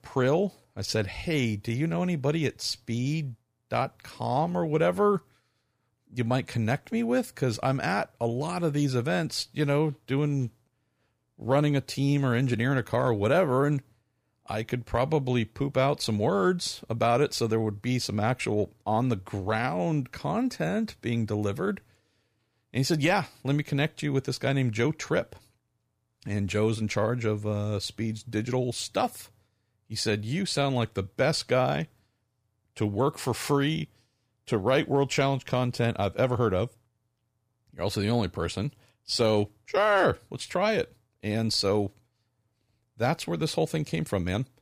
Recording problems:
none

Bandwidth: 15 kHz